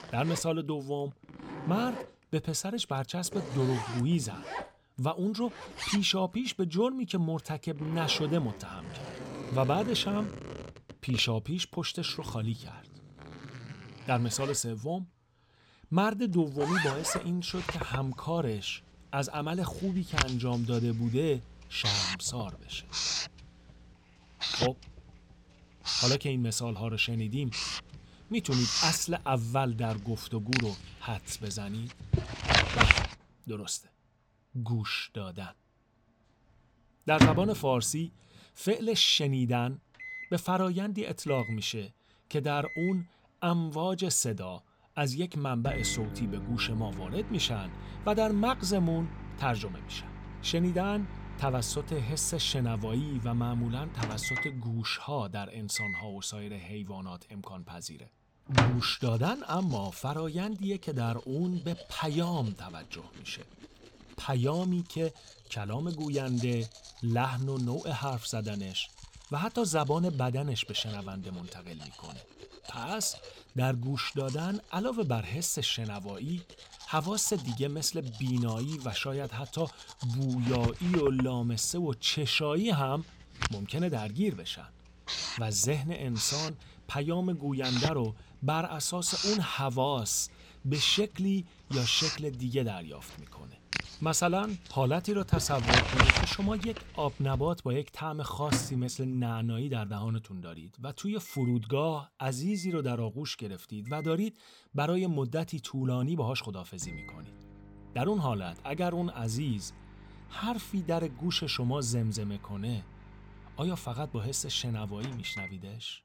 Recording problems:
household noises; loud; throughout; 2 dB below the speech

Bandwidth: 17 kHz